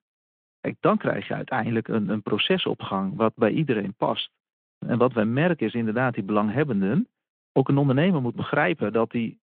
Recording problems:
phone-call audio; nothing above 3.5 kHz

